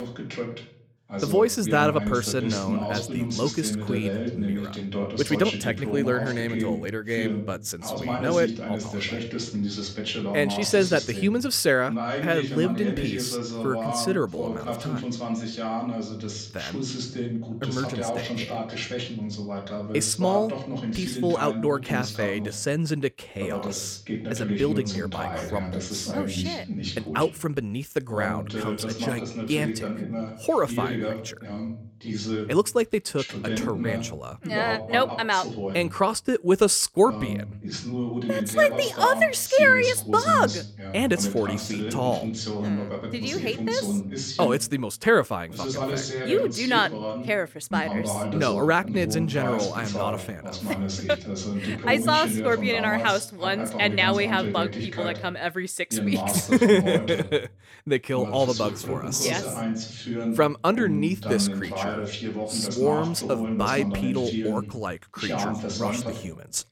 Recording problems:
voice in the background; loud; throughout; 5 dB below the speech

